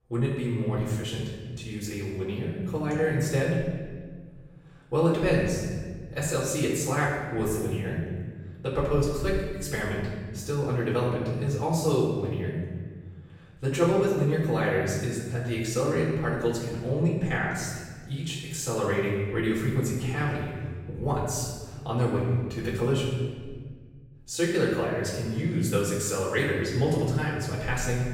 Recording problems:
off-mic speech; far
room echo; noticeable; dies away in 1.4 s

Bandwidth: 16 kHz